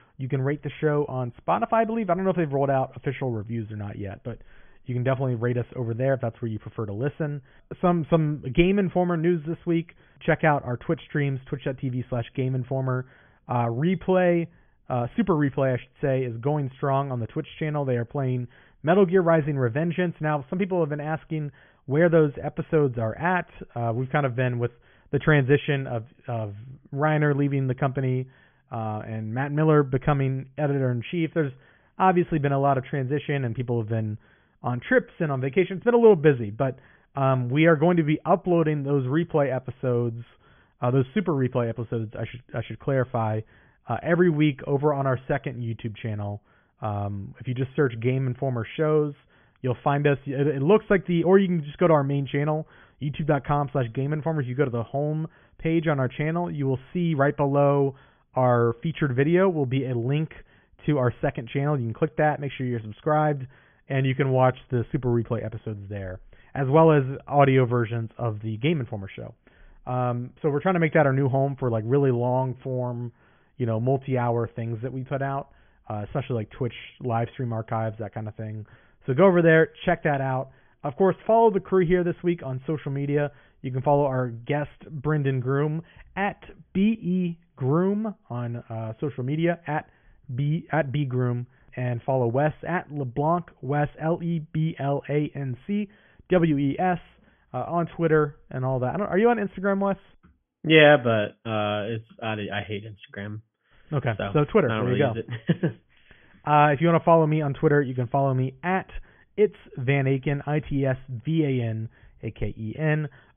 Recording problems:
high frequencies cut off; severe; nothing above 3.5 kHz

